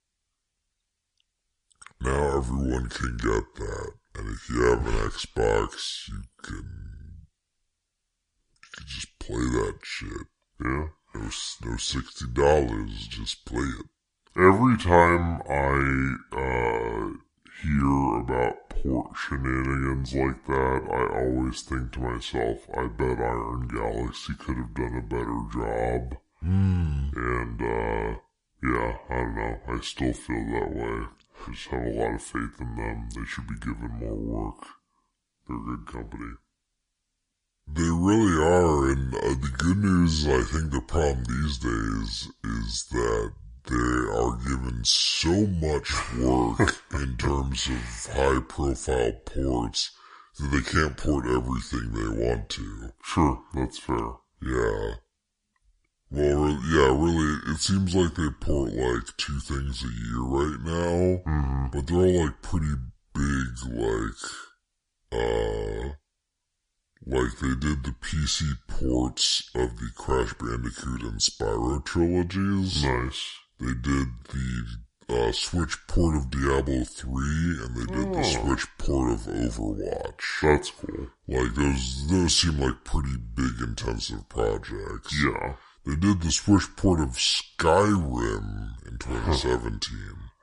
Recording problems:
wrong speed and pitch; too slow and too low; 0.7 times normal speed

